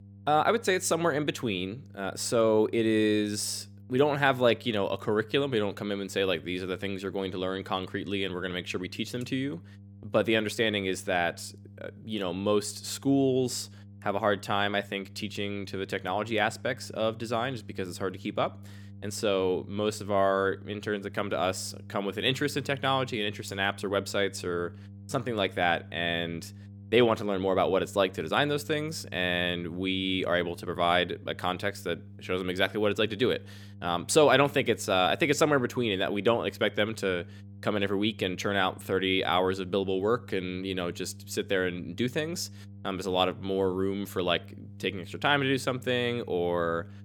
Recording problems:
electrical hum; faint; throughout; 50 Hz, 30 dB below the speech

